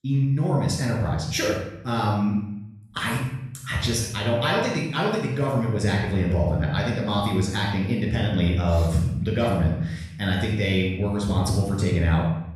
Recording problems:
off-mic speech; far
room echo; noticeable; dies away in 0.8 s

